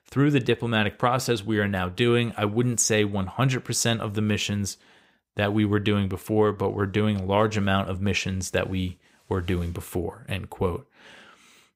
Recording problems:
none

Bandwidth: 15.5 kHz